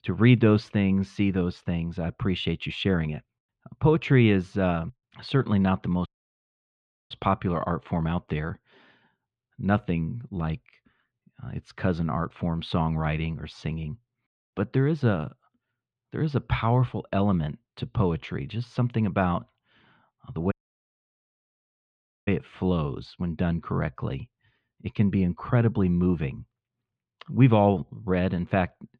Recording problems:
muffled; slightly; fading above 3.5 kHz
audio cutting out; at 6 s for 1 s and at 21 s for 2 s

